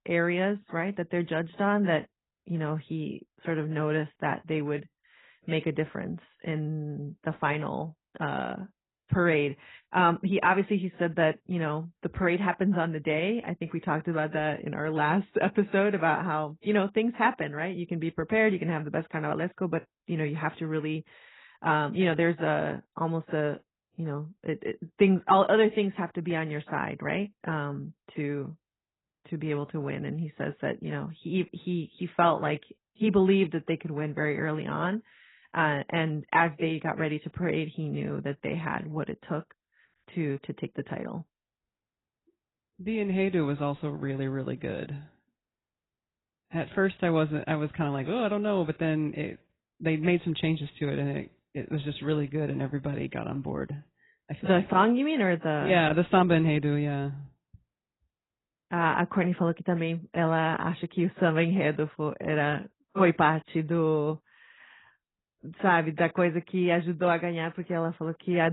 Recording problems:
garbled, watery; badly; nothing above 4 kHz
abrupt cut into speech; at the end

